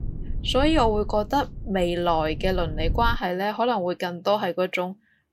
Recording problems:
low rumble; faint; until 3 s; 25 dB below the speech

